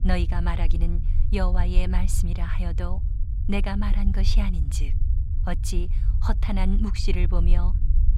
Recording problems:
low rumble; noticeable; throughout; 10 dB below the speech

